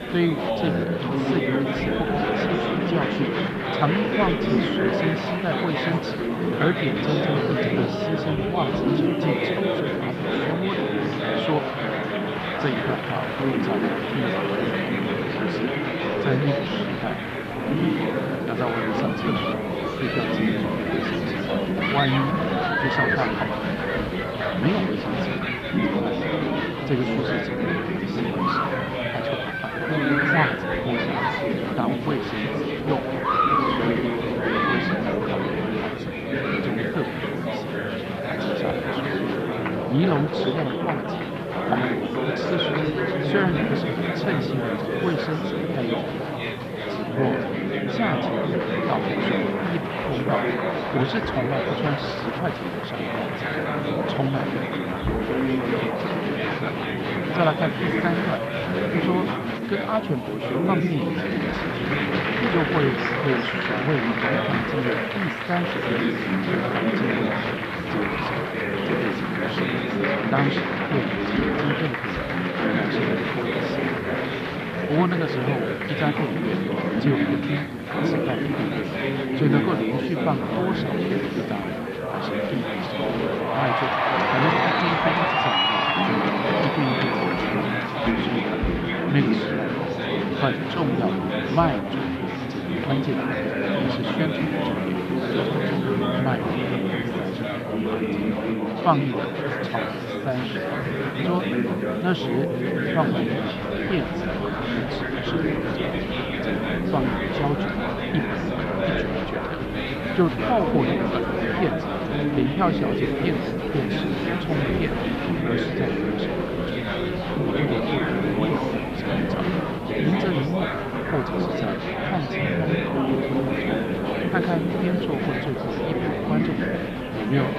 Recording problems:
muffled; slightly; fading above 3.5 kHz
murmuring crowd; very loud; throughout; 4 dB above the speech
hiss; faint; throughout; 25 dB below the speech

